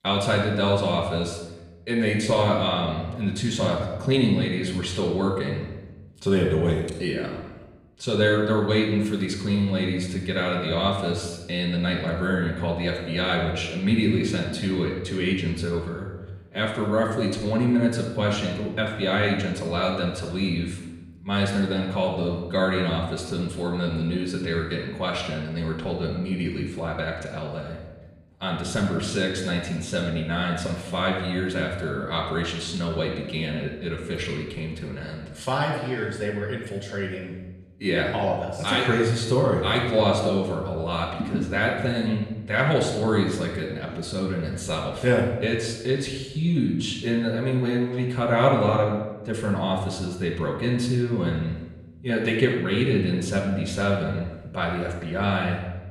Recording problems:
off-mic speech; far
room echo; noticeable; dies away in 1 s

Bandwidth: 15.5 kHz